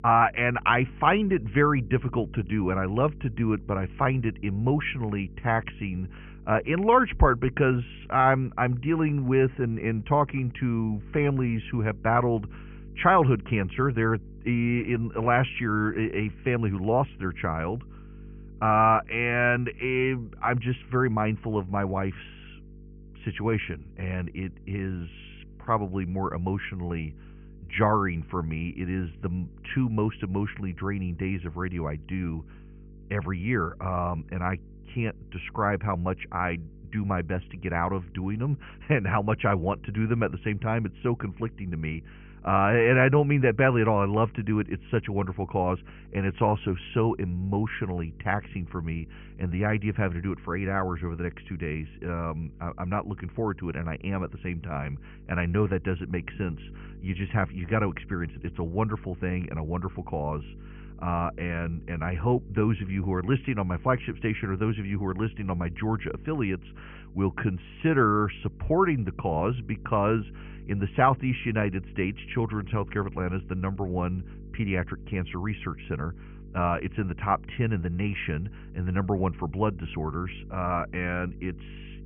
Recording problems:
high frequencies cut off; severe; nothing above 3 kHz
electrical hum; faint; throughout; 50 Hz, 30 dB below the speech

